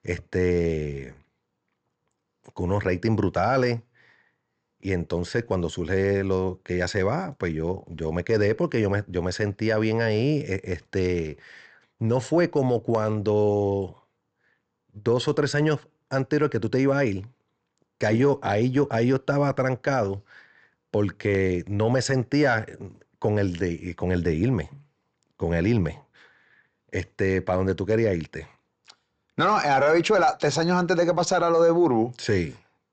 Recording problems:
high frequencies cut off; noticeable; nothing above 8 kHz

